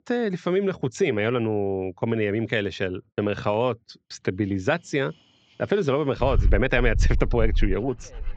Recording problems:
high frequencies cut off; noticeable; nothing above 8 kHz
muffled; very slightly; fading above 3.5 kHz
animal sounds; loud; from 4.5 s on; 2 dB below the speech

